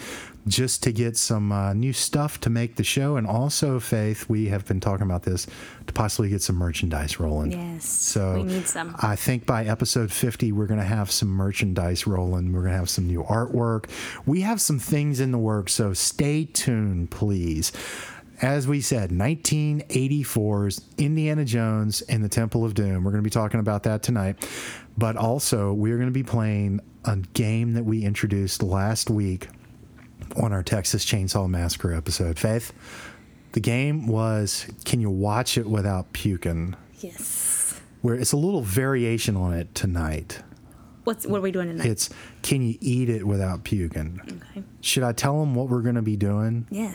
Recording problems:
squashed, flat; heavily

